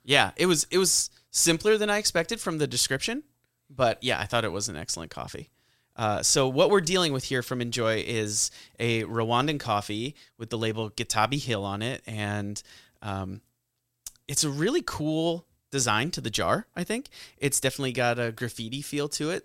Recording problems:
none

